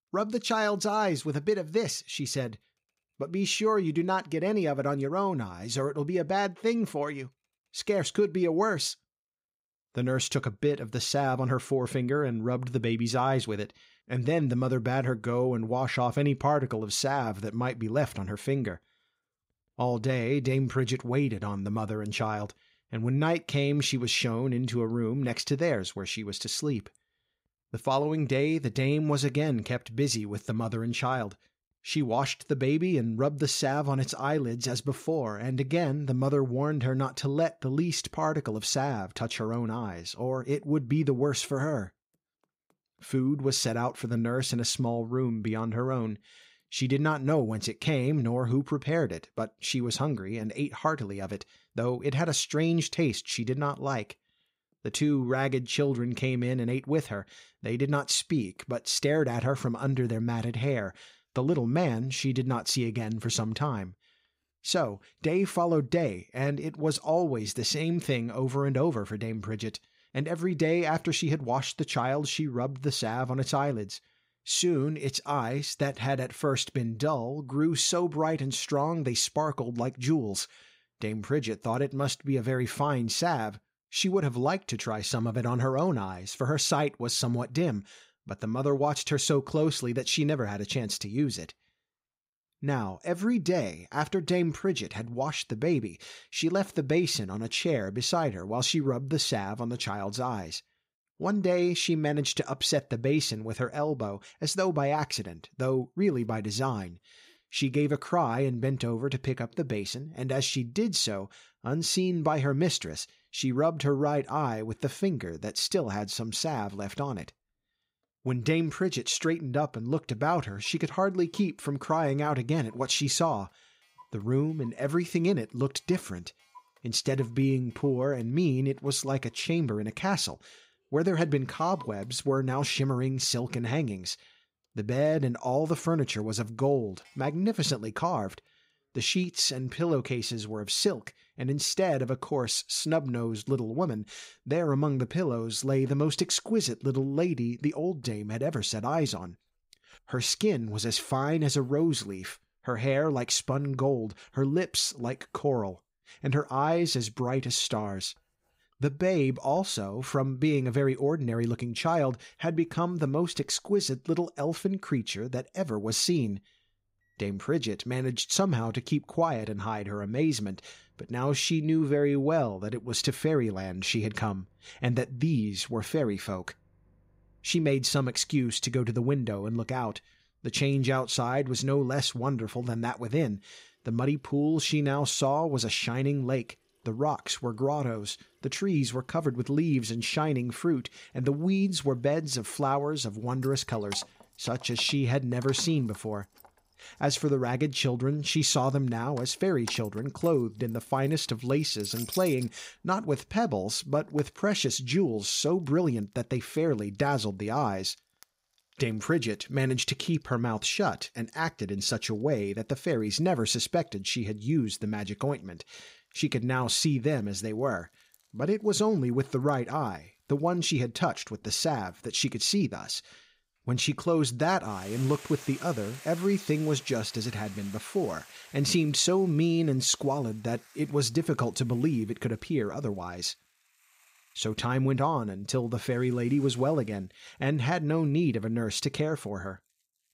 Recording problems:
household noises; faint; throughout; 25 dB below the speech

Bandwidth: 15.5 kHz